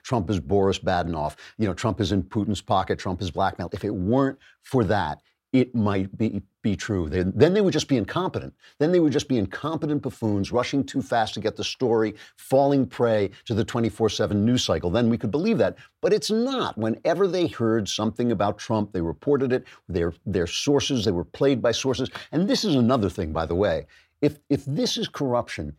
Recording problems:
none

